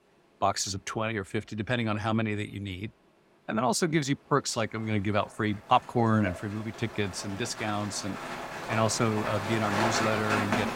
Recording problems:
rain or running water; loud; throughout; 4 dB below the speech

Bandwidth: 16 kHz